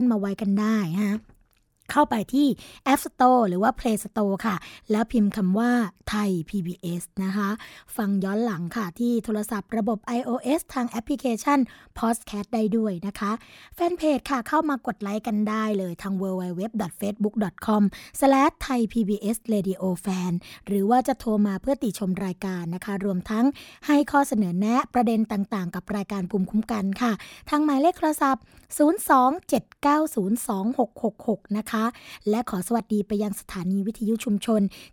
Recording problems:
abrupt cut into speech; at the start

